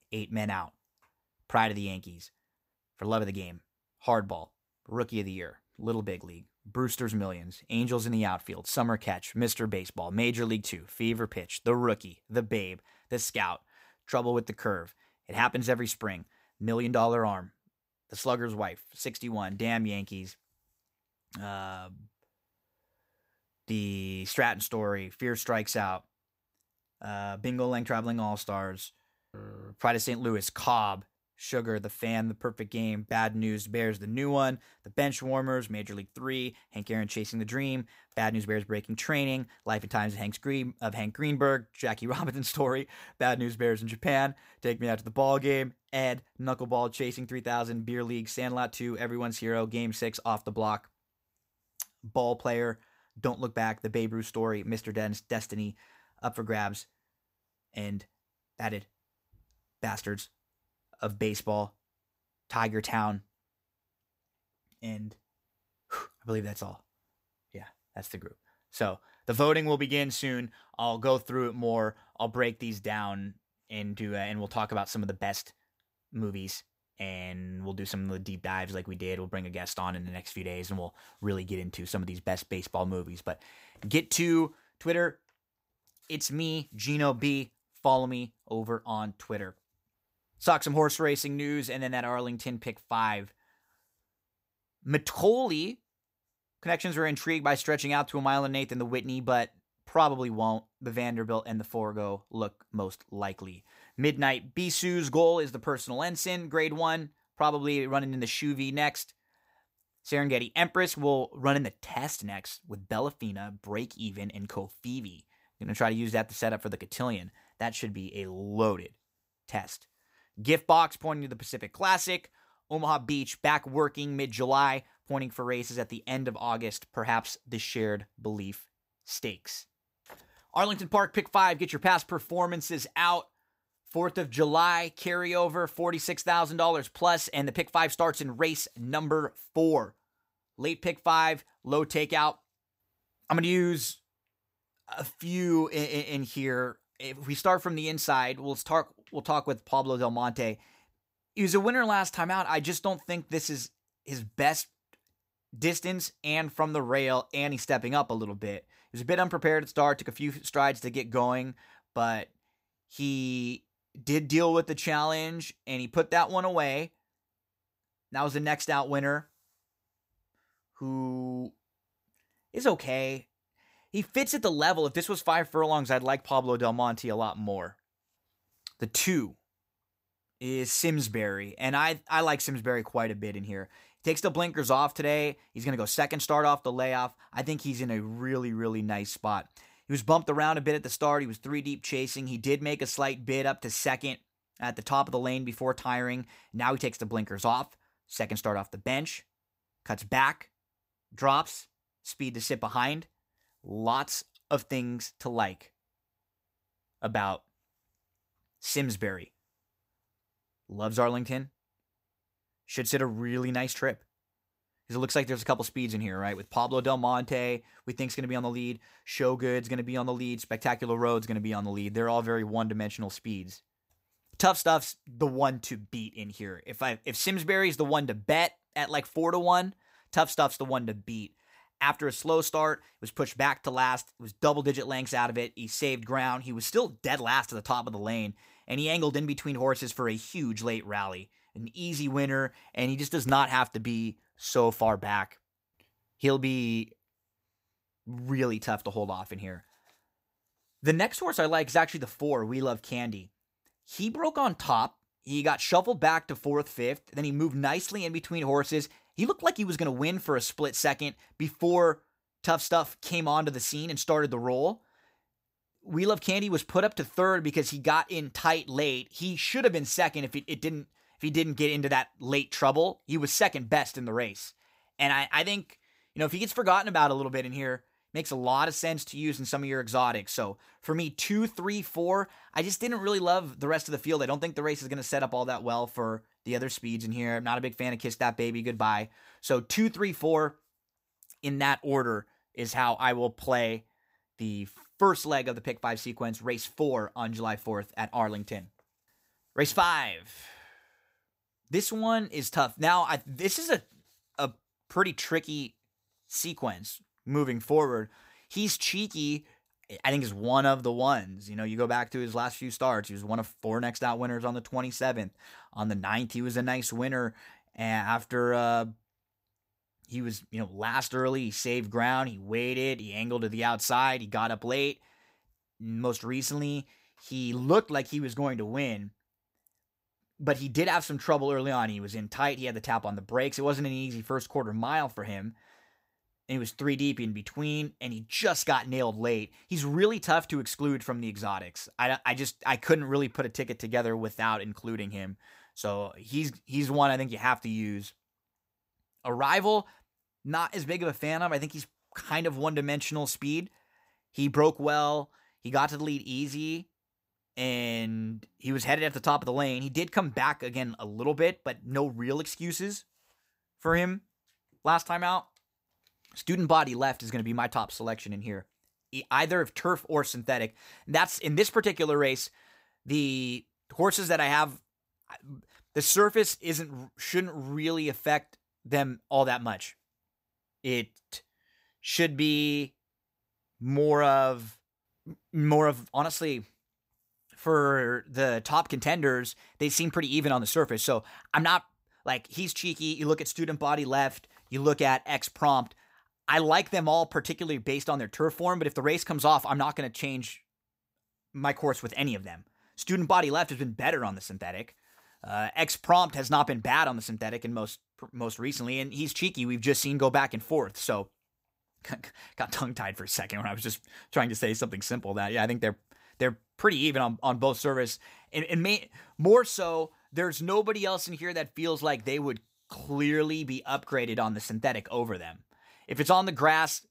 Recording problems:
none

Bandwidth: 15.5 kHz